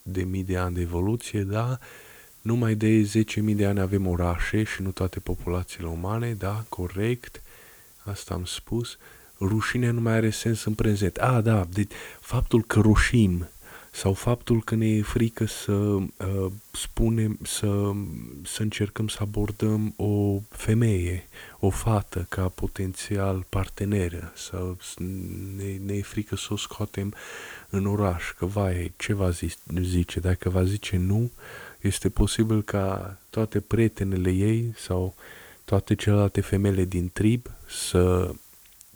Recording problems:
hiss; faint; throughout; 25 dB below the speech

